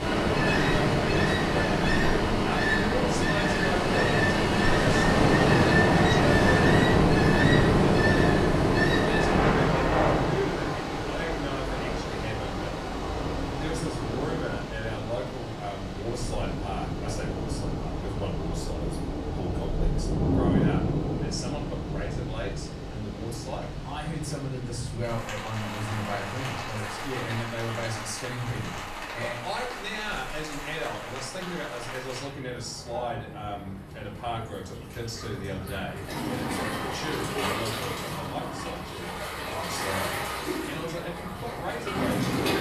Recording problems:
off-mic speech; far
room echo; slight; dies away in 0.5 s
rain or running water; very loud; throughout; 8 dB above the speech

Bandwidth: 14 kHz